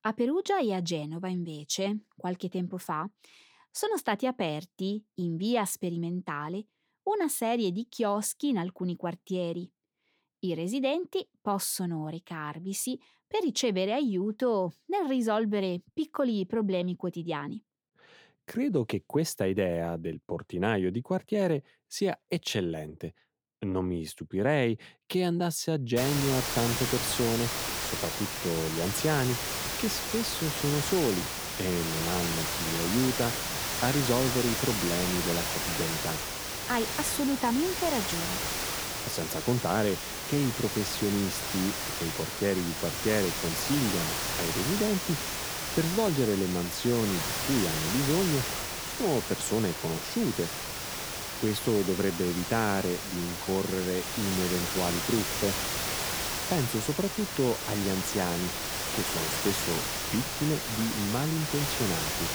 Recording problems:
hiss; loud; from 26 s on; as loud as the speech

